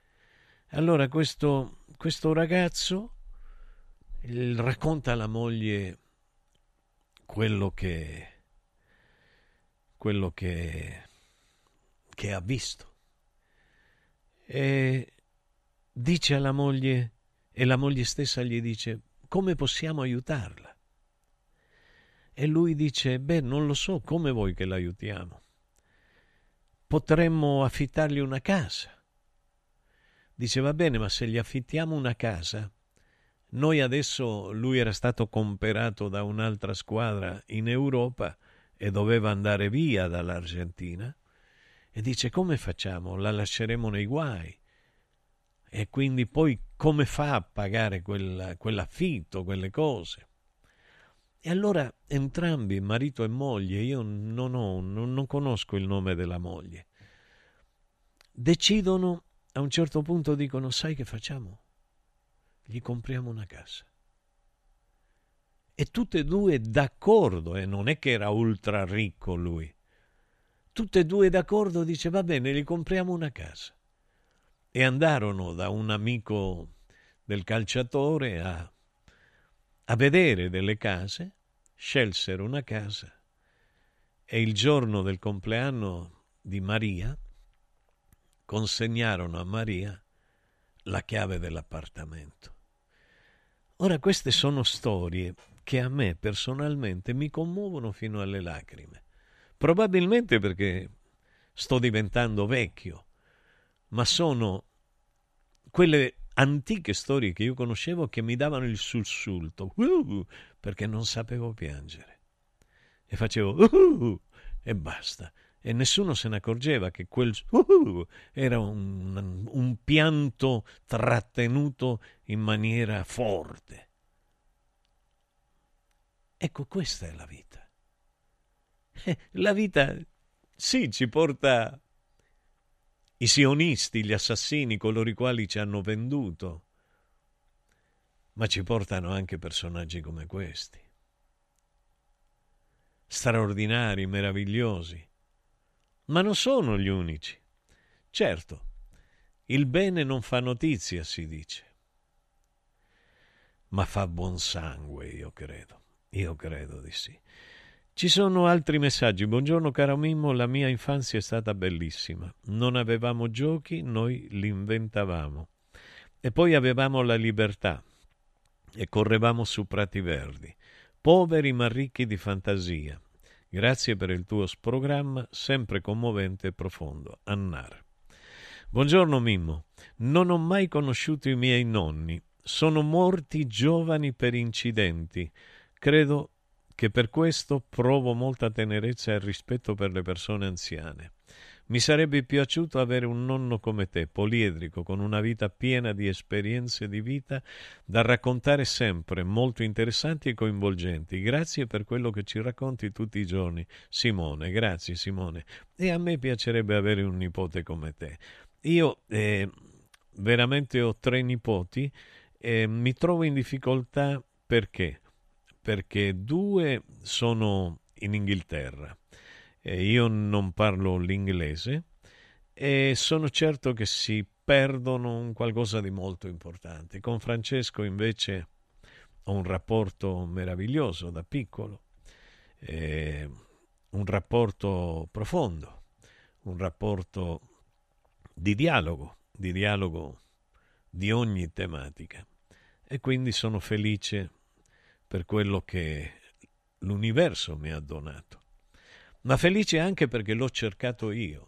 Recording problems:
none

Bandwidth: 13.5 kHz